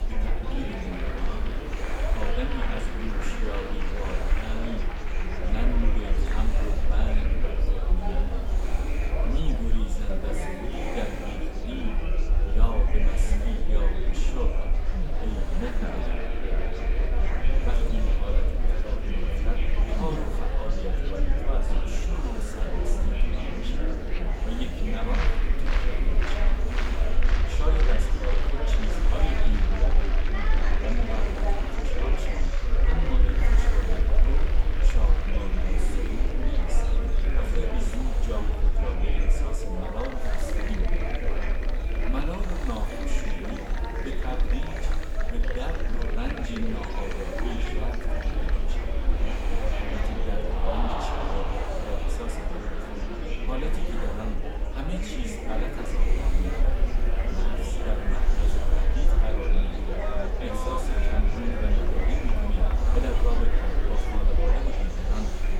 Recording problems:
room echo; slight; dies away in 0.7 s
off-mic speech; somewhat distant
murmuring crowd; very loud; throughout; 3 dB above the speech
hiss; noticeable; throughout; 10 dB below the speech
low rumble; noticeable; throughout; 15 dB below the speech

